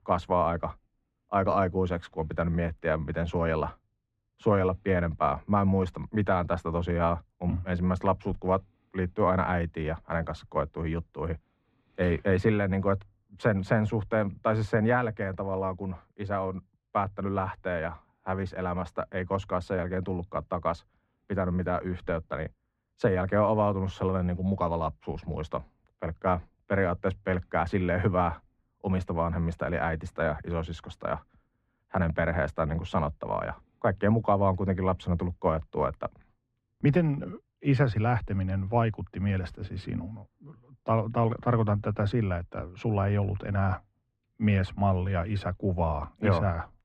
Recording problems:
muffled; very; fading above 1.5 kHz

